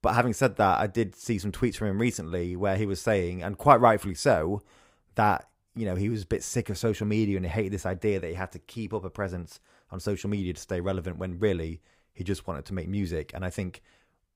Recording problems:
none

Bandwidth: 15.5 kHz